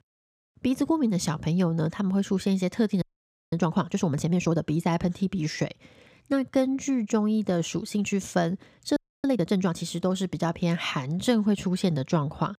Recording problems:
audio freezing; at 3 s for 0.5 s and at 9 s

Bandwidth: 15 kHz